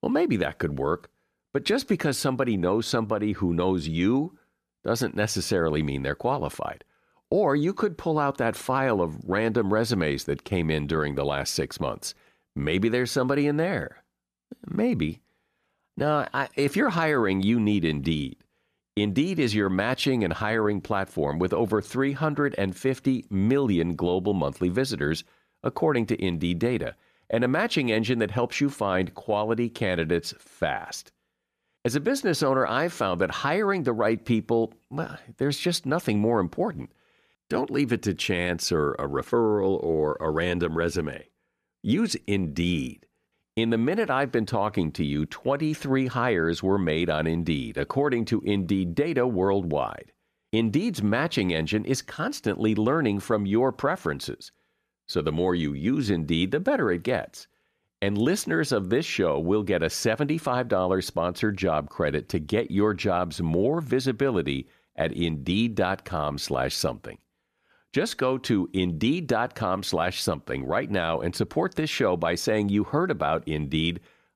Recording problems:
none

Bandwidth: 14.5 kHz